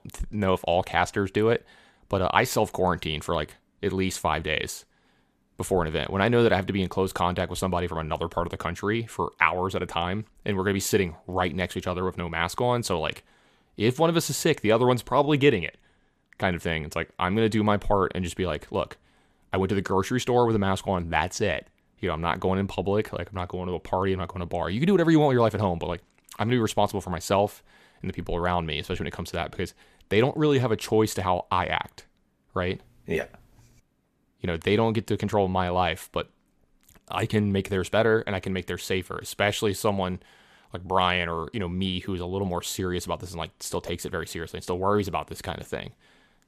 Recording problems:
none

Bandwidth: 14.5 kHz